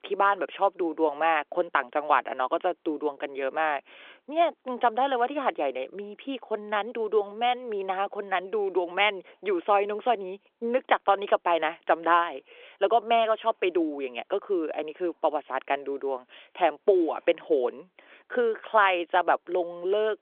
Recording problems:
phone-call audio; nothing above 3.5 kHz

